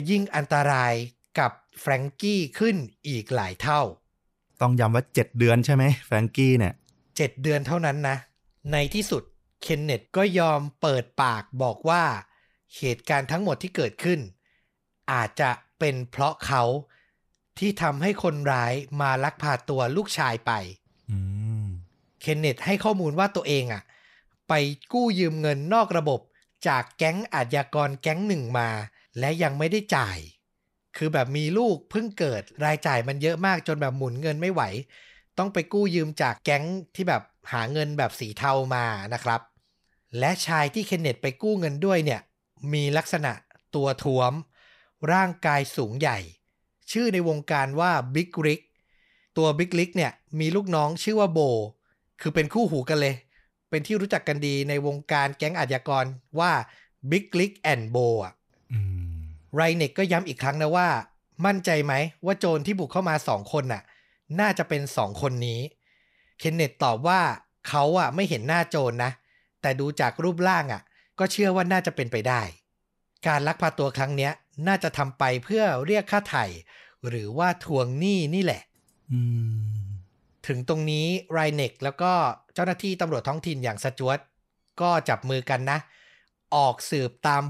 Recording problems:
abrupt cut into speech; at the start and the end

